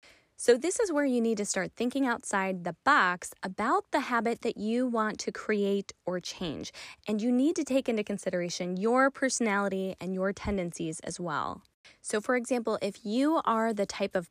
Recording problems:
none

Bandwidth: 15 kHz